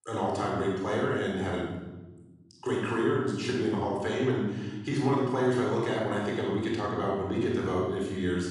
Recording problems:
off-mic speech; far
room echo; noticeable; dies away in 1.4 s

